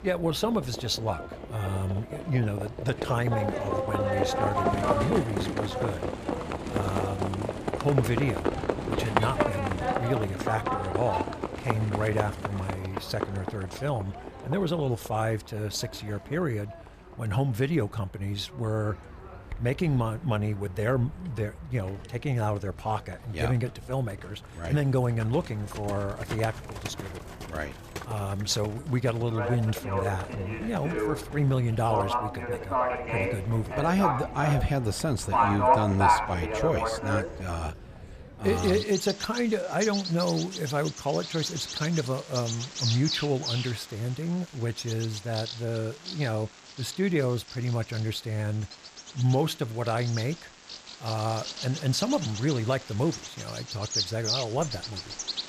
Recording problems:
animal sounds; loud; throughout; 2 dB below the speech

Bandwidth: 14.5 kHz